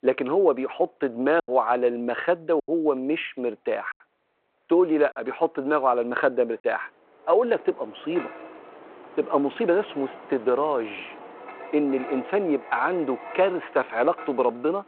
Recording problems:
phone-call audio
wind in the background; noticeable; throughout; 15 dB below the speech
choppy; occasionally; 2% of the speech affected

